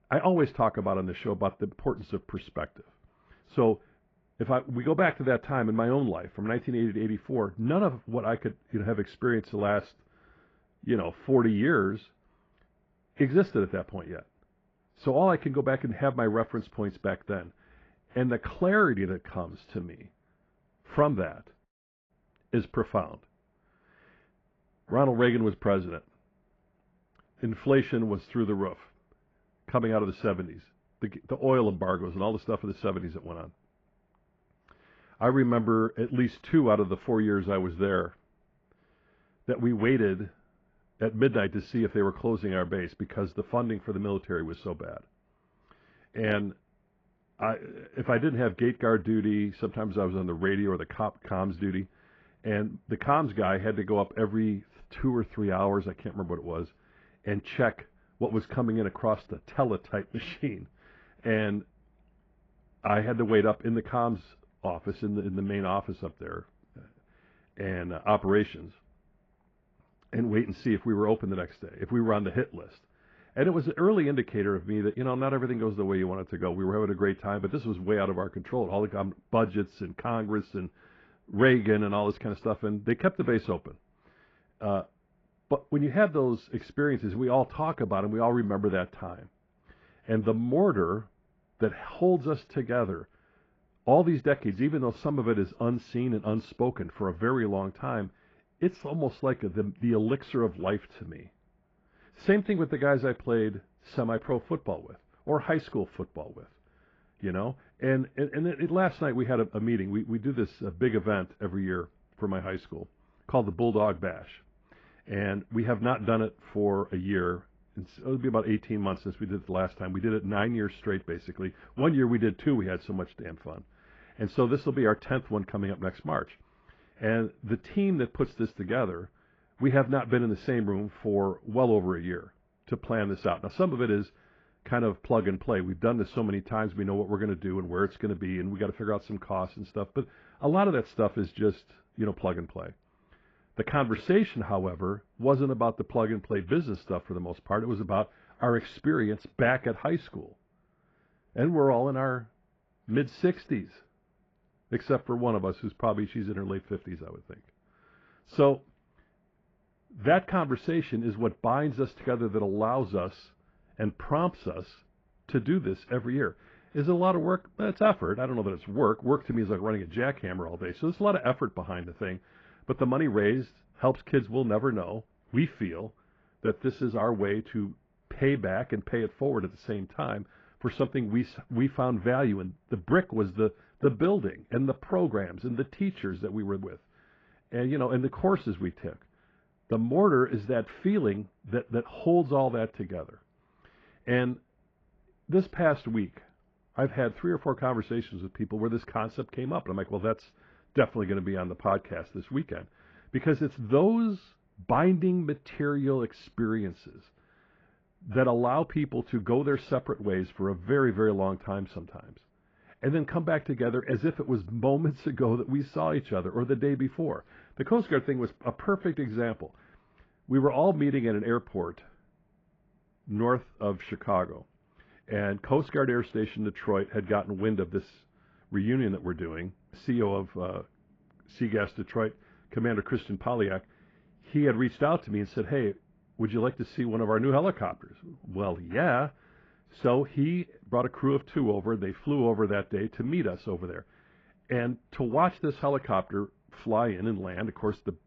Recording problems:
garbled, watery; badly
muffled; very; fading above 2.5 kHz

